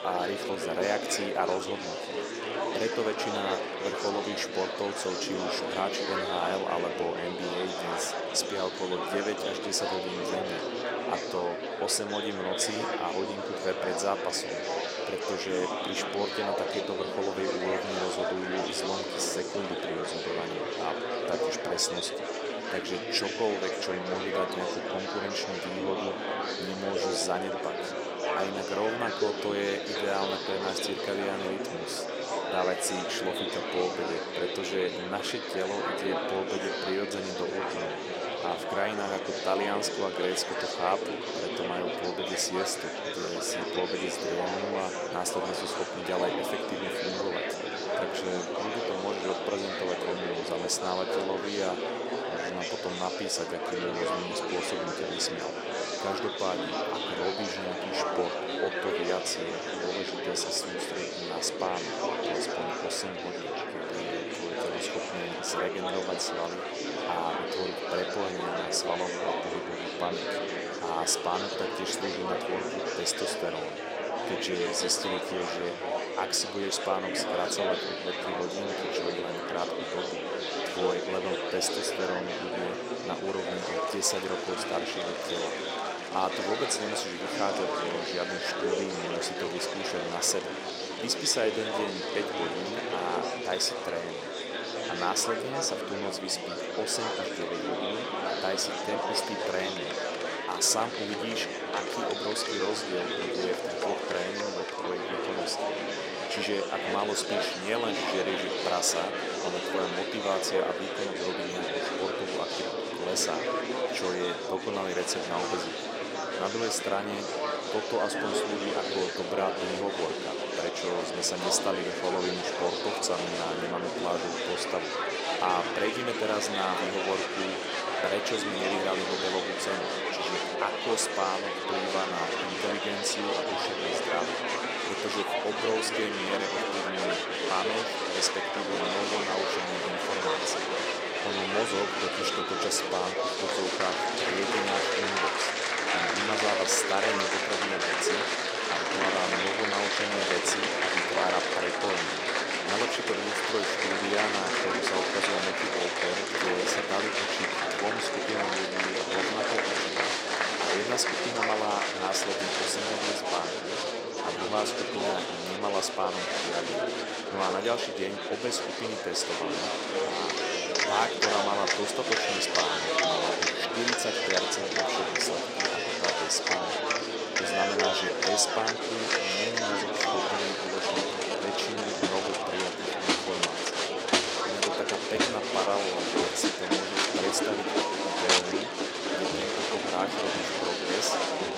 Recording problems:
thin; somewhat; fading below 400 Hz
murmuring crowd; very loud; throughout; 3 dB above the speech

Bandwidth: 16 kHz